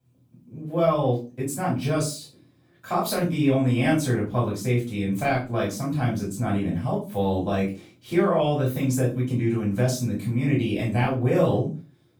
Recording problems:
off-mic speech; far
room echo; slight; dies away in 0.3 s

